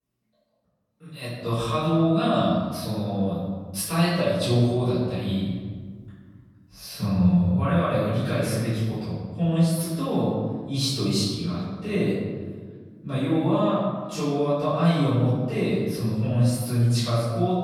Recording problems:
room echo; strong; dies away in 1.5 s
off-mic speech; far

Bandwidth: 17.5 kHz